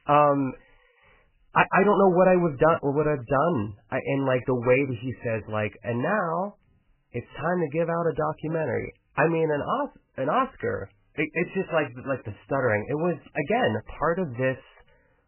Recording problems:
garbled, watery; badly; nothing above 3 kHz

